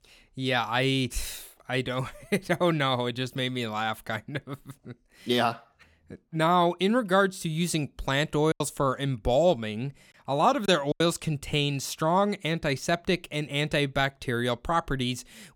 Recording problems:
choppy; occasionally; from 8.5 to 11 s; 5% of the speech affected

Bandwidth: 17.5 kHz